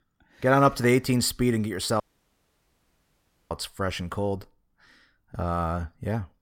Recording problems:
audio cutting out; at 2 s for 1.5 s

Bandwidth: 16.5 kHz